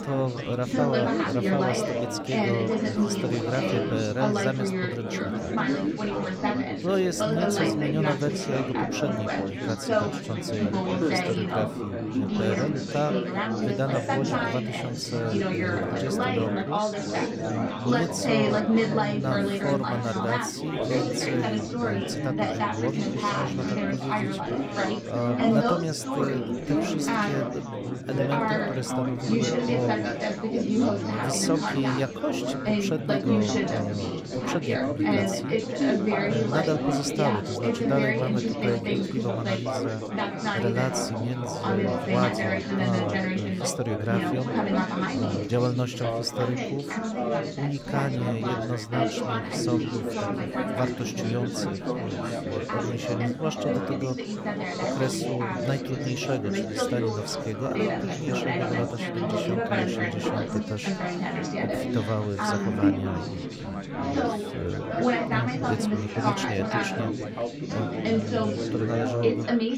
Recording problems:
chatter from many people; very loud; throughout; 4 dB above the speech

